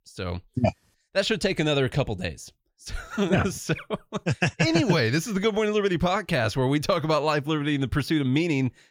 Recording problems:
none

